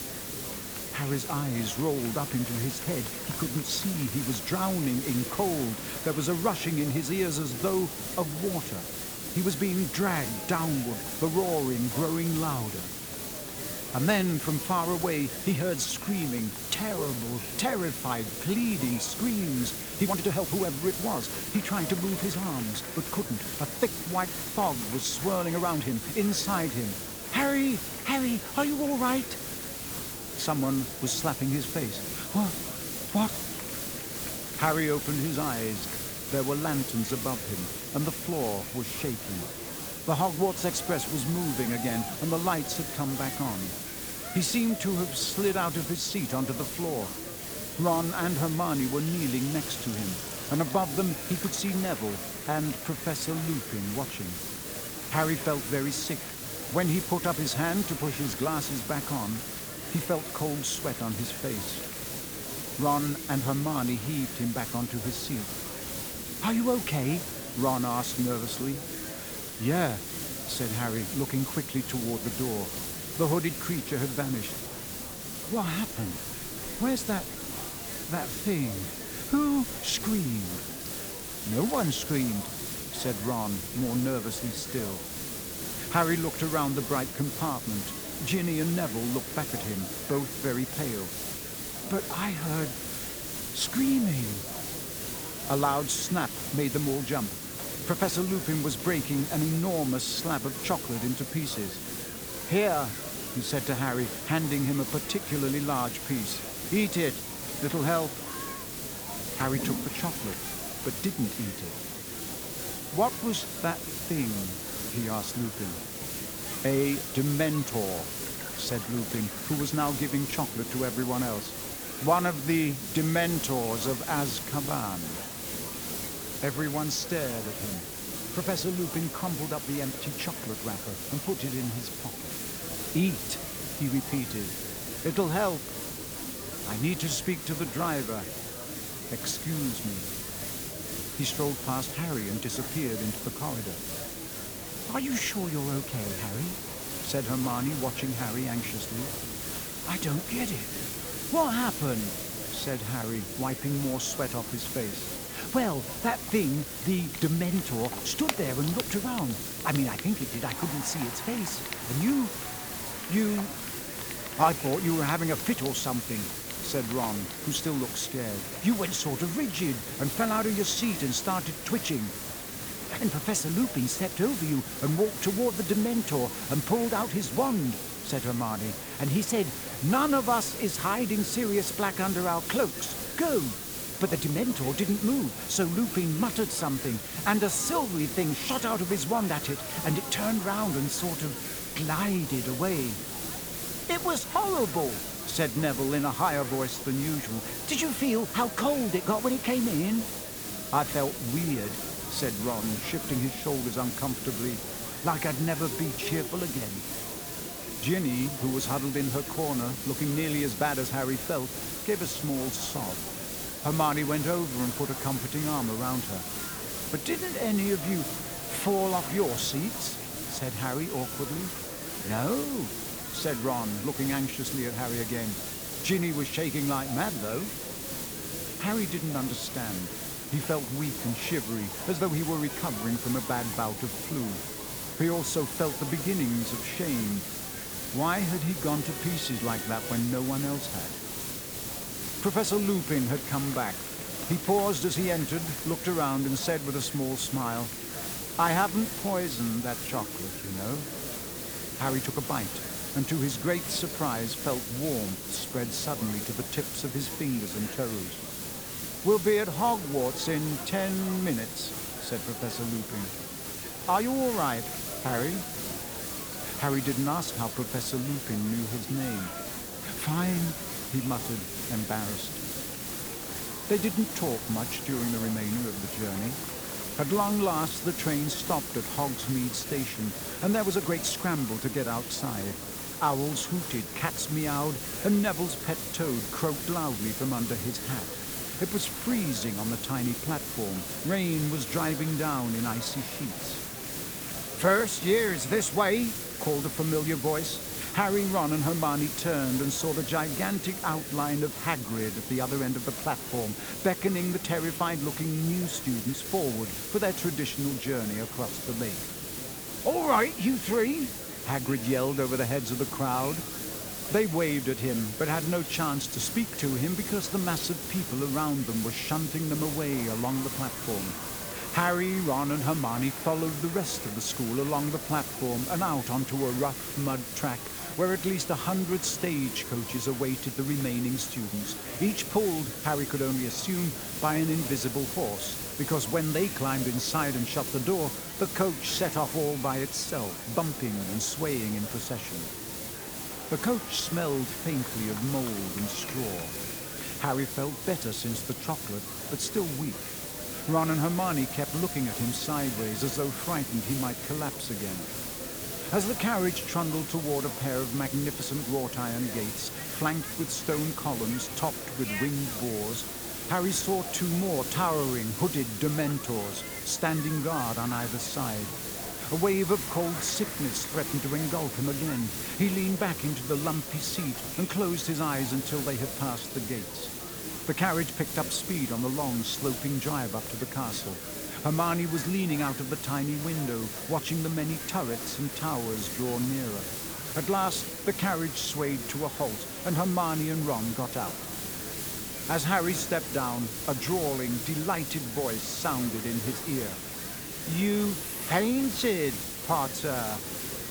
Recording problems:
hiss; loud; throughout; 4 dB below the speech
household noises; noticeable; throughout; 20 dB below the speech
murmuring crowd; noticeable; throughout; 15 dB below the speech
uneven, jittery; strongly; from 17 s to 6:27

